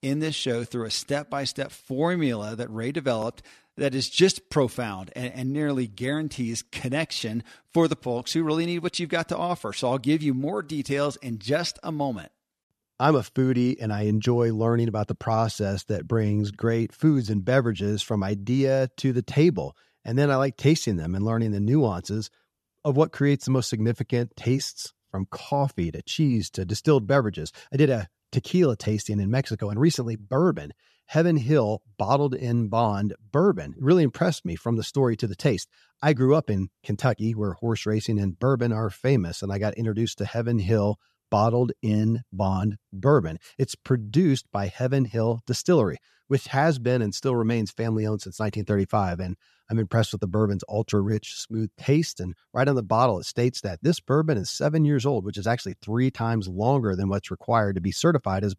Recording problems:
none

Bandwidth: 13.5 kHz